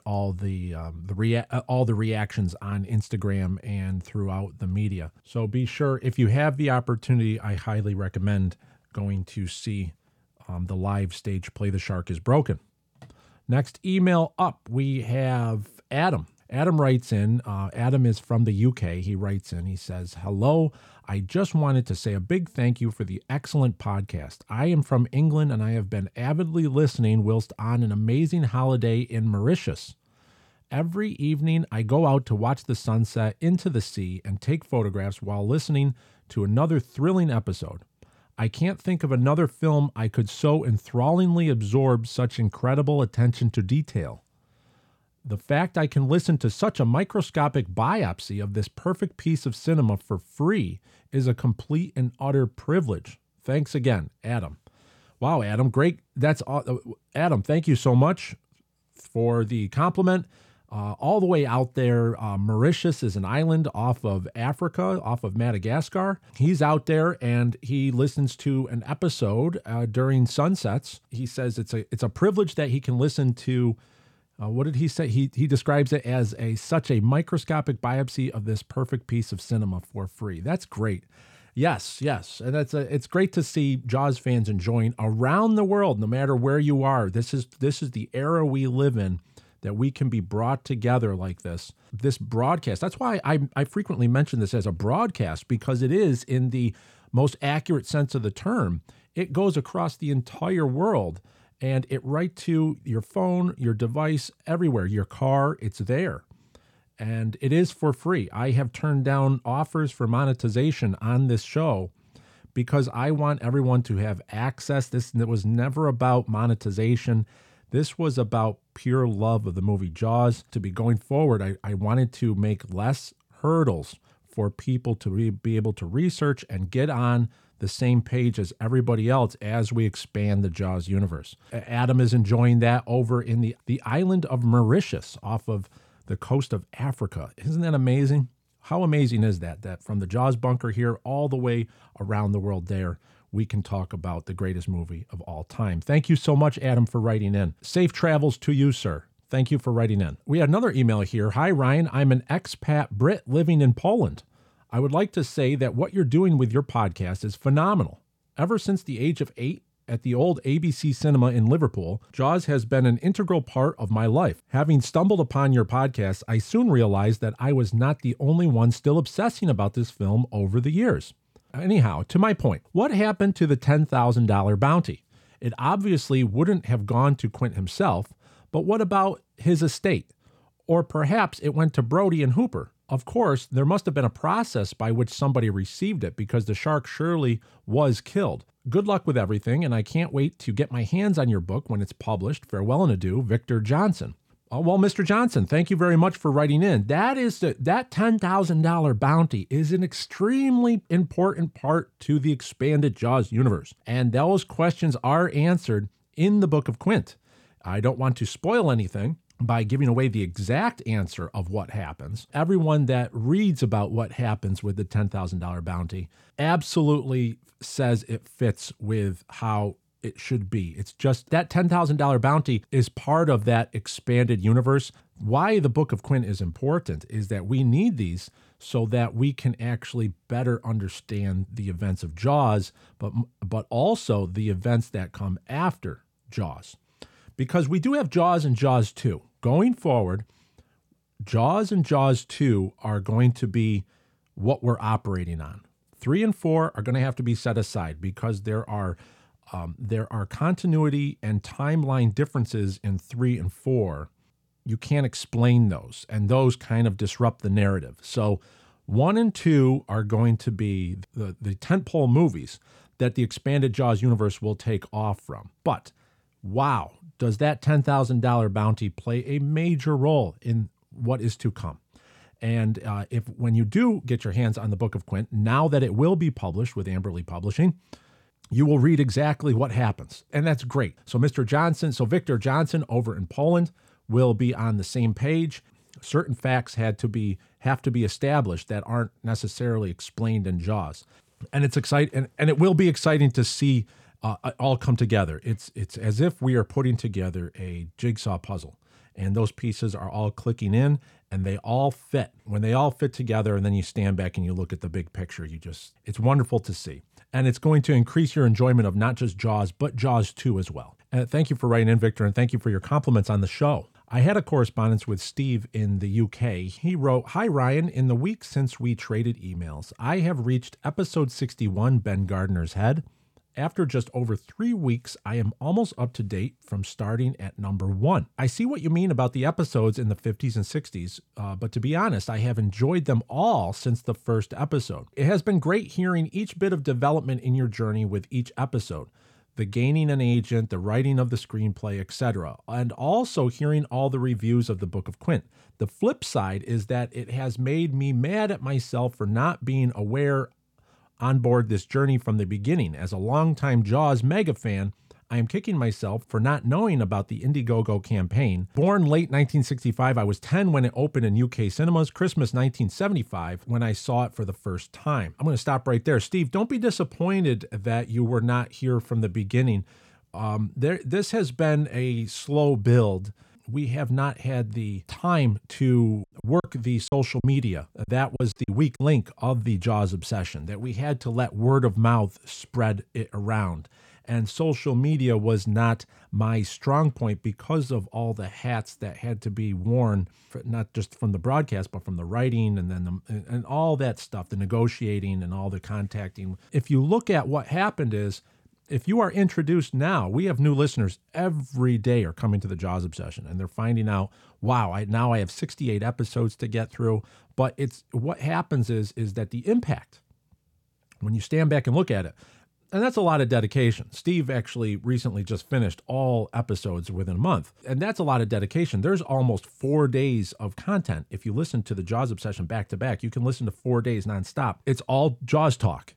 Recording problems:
choppy; very; from 6:16 to 6:19; 11% of the speech affected

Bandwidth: 17.5 kHz